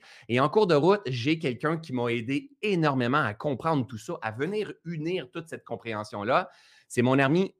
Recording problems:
none

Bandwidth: 15 kHz